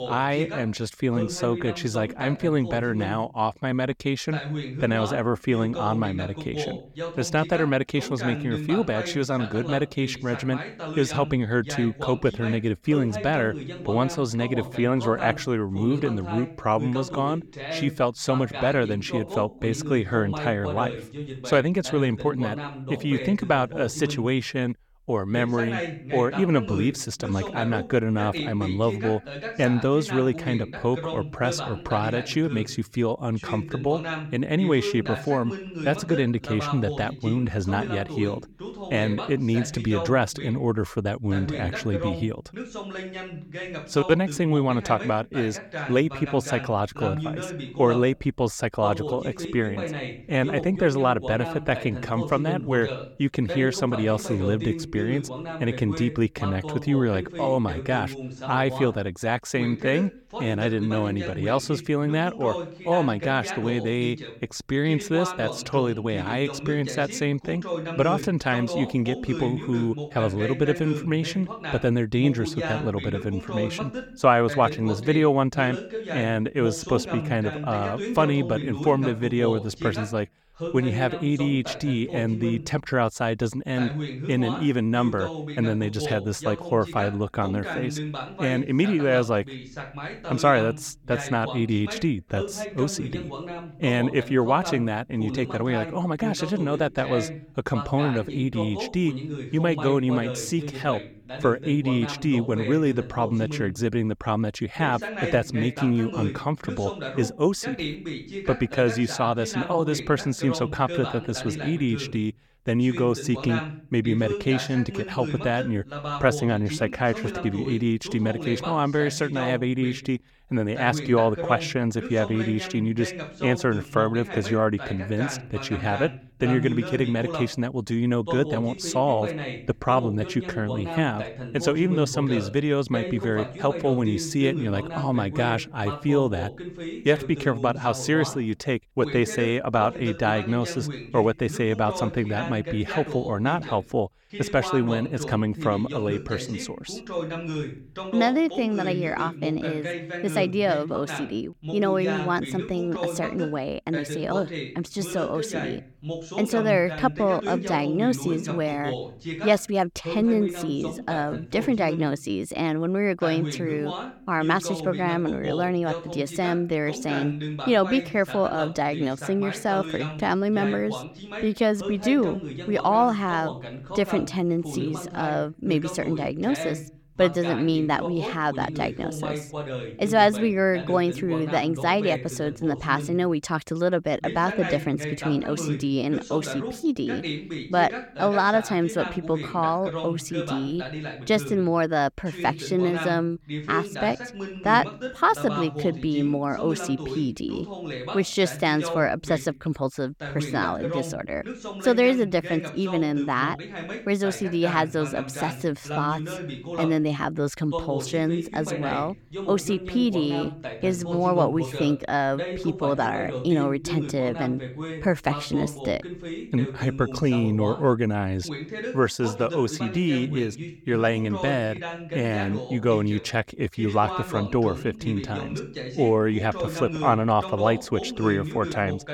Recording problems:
voice in the background; loud; throughout; 9 dB below the speech

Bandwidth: 17.5 kHz